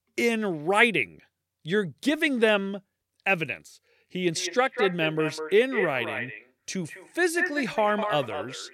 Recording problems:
echo of what is said; strong; from 4 s on; 200 ms later, 7 dB below the speech

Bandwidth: 16.5 kHz